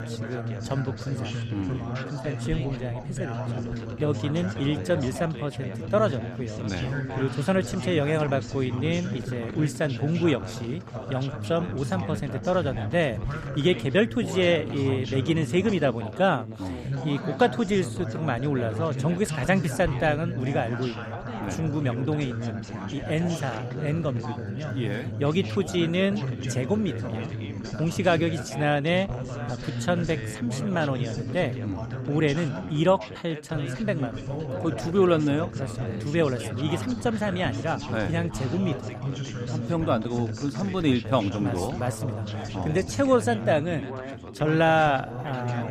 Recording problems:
background chatter; loud; throughout; 3 voices, 6 dB below the speech

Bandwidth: 15 kHz